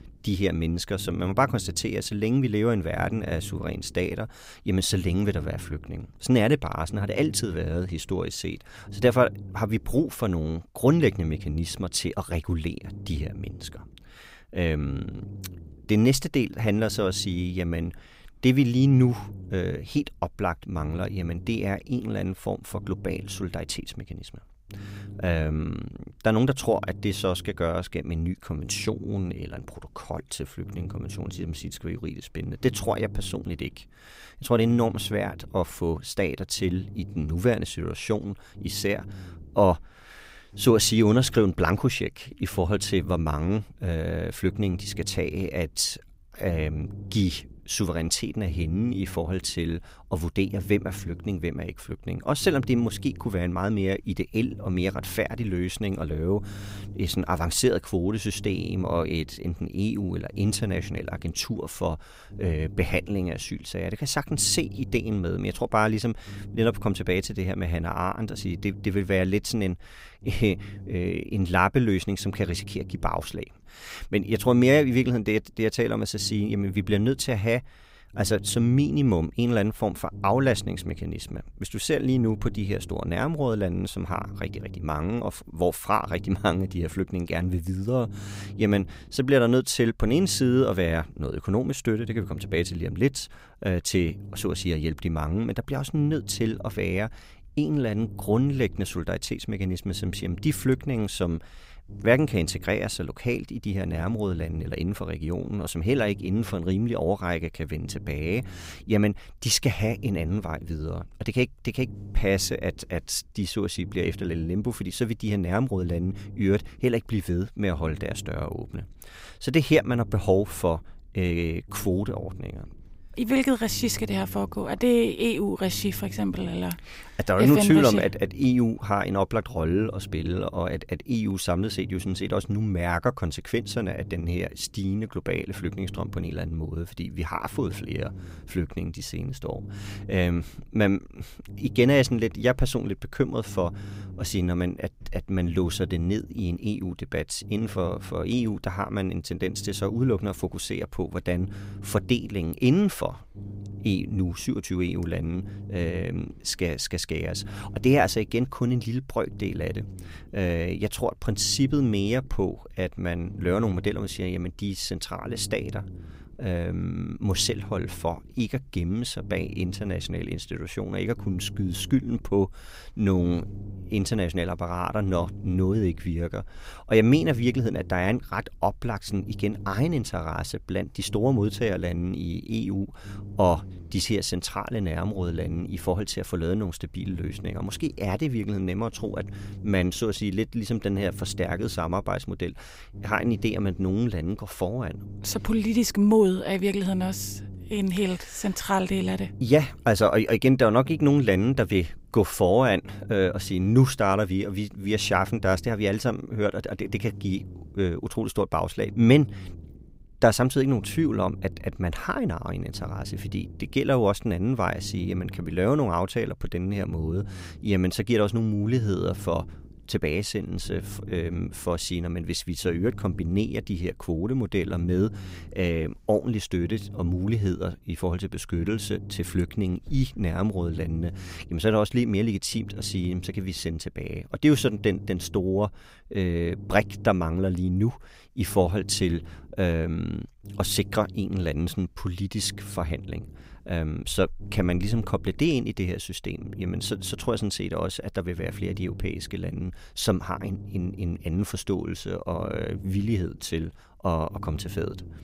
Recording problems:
low rumble; faint; throughout; 20 dB below the speech

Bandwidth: 15.5 kHz